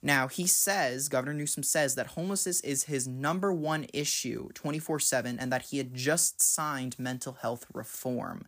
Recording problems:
none

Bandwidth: 15 kHz